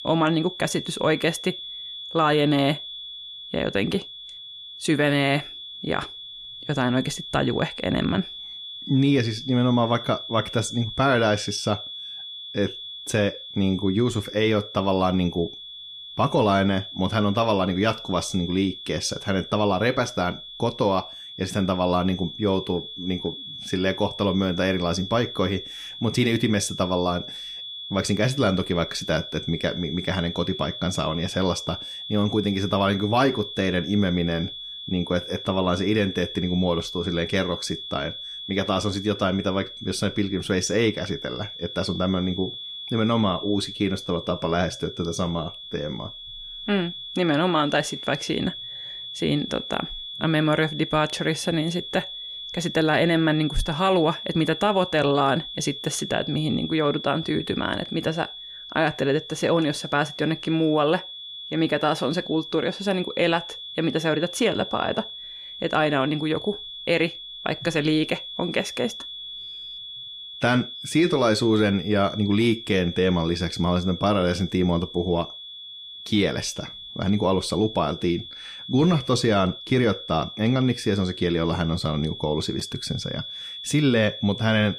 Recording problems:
high-pitched whine; noticeable; throughout; 3.5 kHz, 10 dB below the speech

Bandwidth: 15 kHz